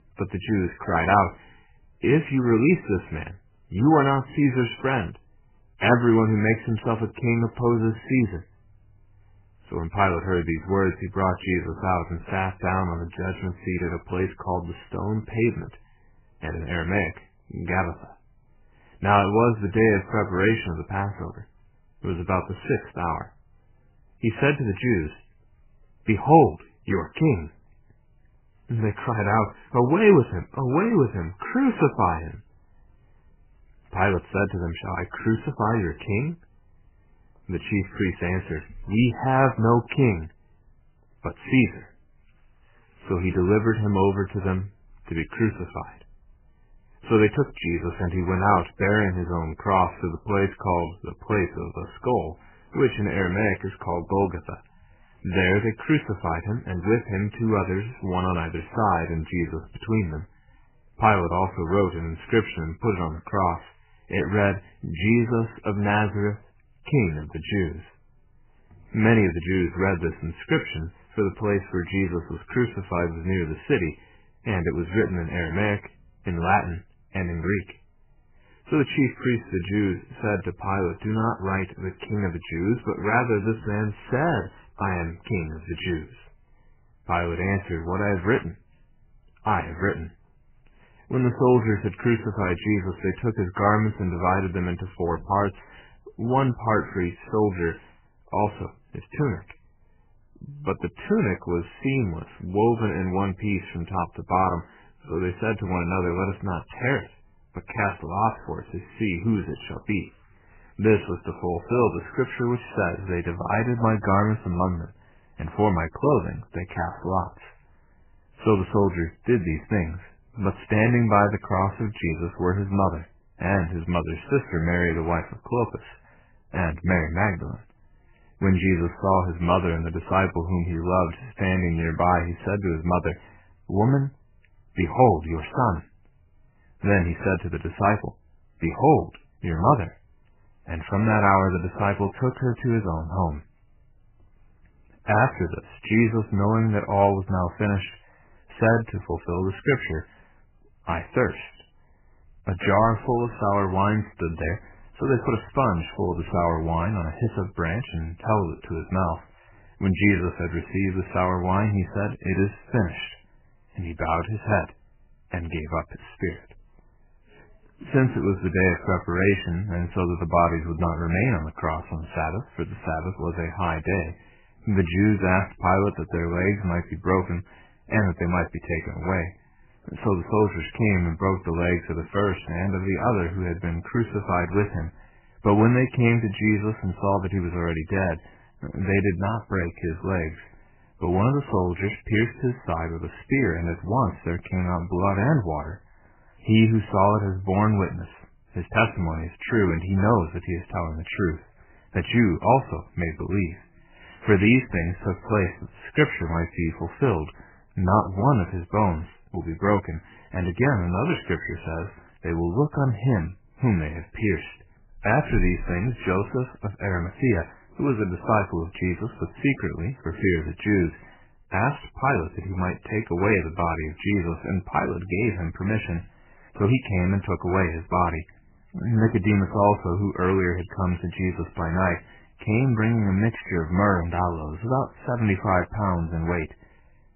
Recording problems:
garbled, watery; badly; nothing above 3 kHz

